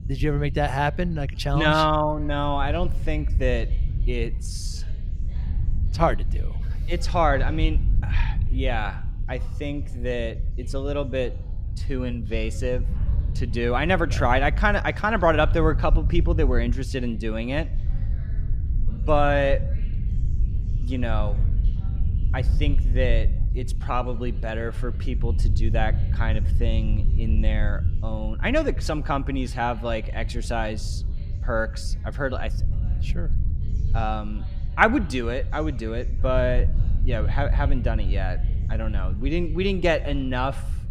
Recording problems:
low rumble; noticeable; throughout; 20 dB below the speech
background chatter; faint; throughout; 3 voices, 30 dB below the speech

